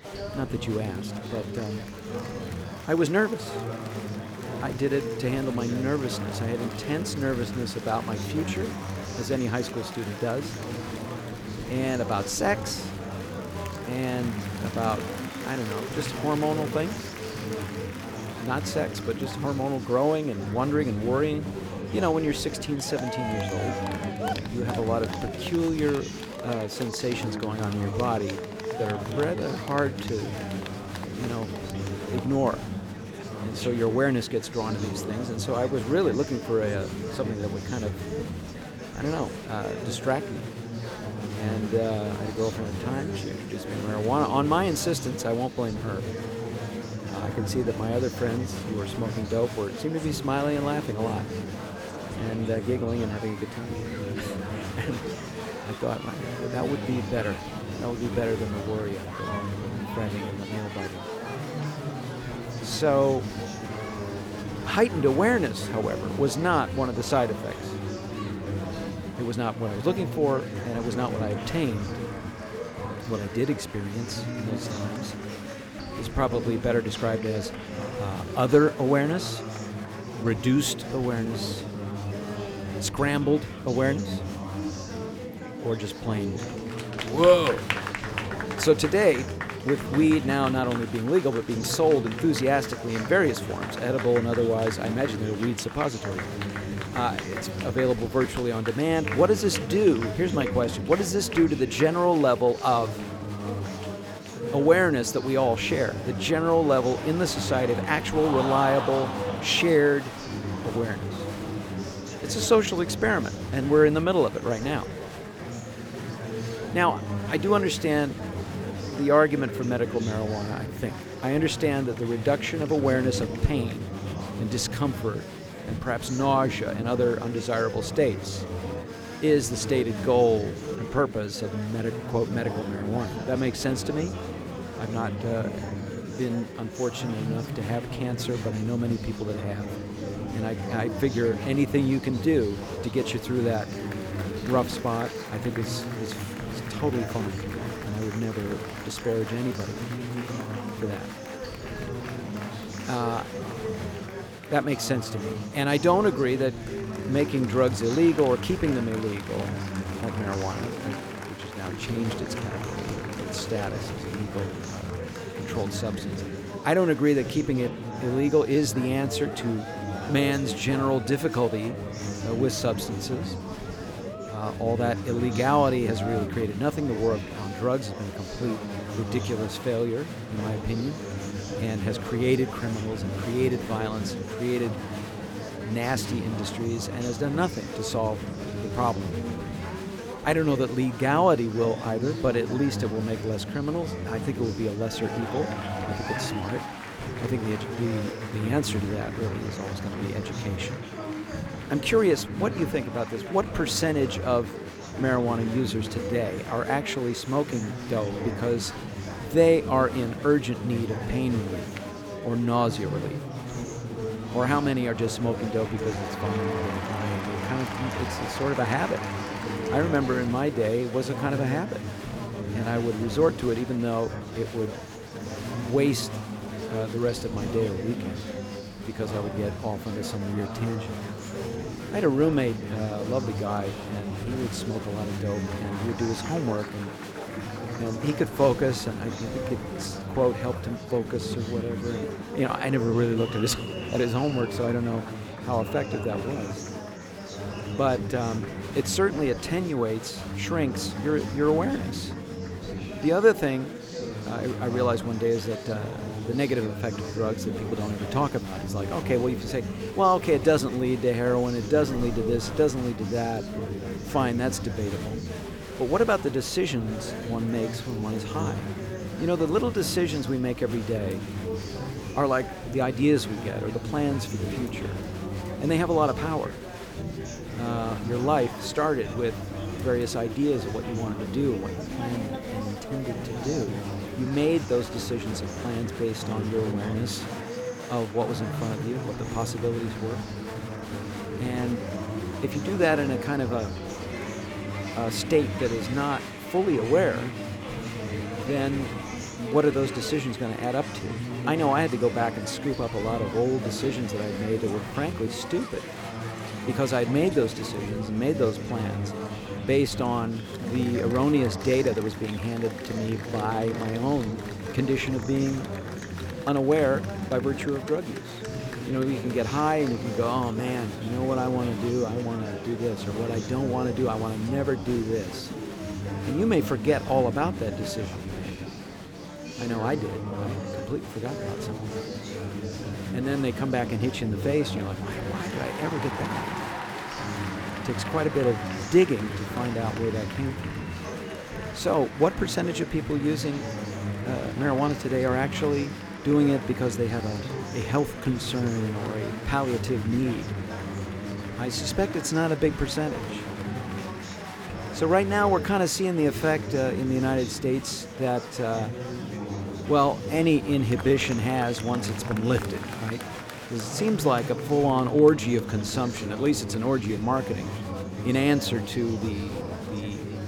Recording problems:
murmuring crowd; loud; throughout; 7 dB below the speech

